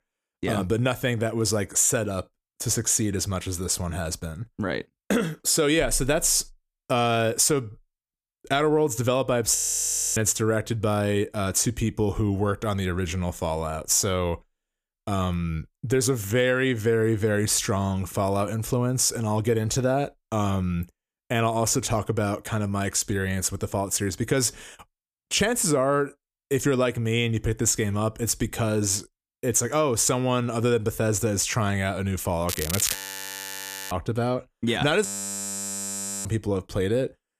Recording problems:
crackling; loud; at 32 s; 6 dB below the speech
audio freezing; at 9.5 s for 0.5 s, at 33 s for 1 s and at 35 s for 1 s

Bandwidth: 14.5 kHz